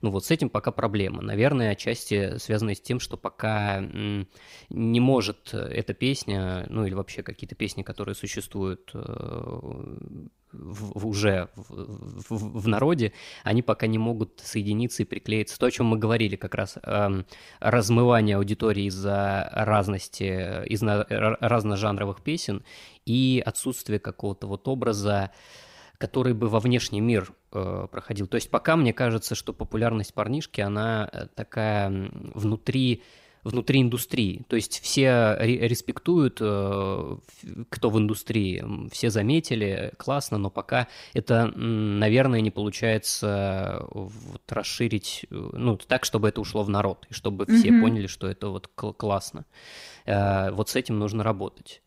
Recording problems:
none

